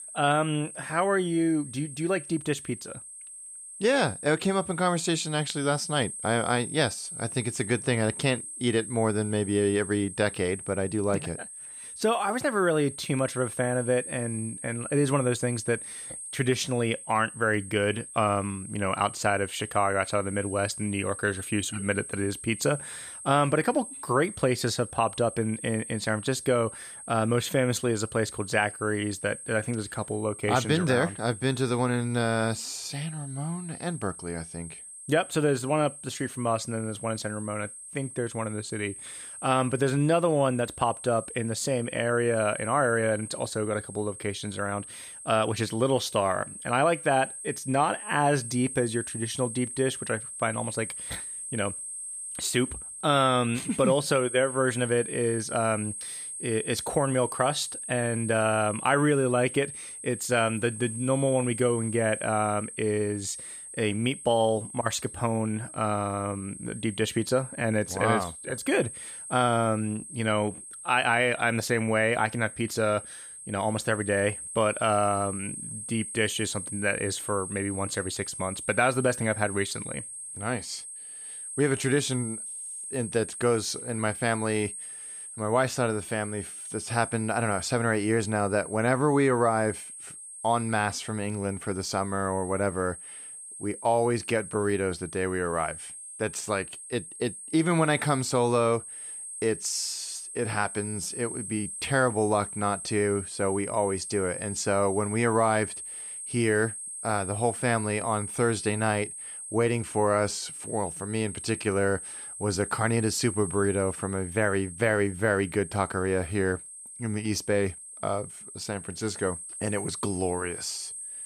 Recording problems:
high-pitched whine; loud; throughout; 8.5 kHz, 9 dB below the speech

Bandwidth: 15 kHz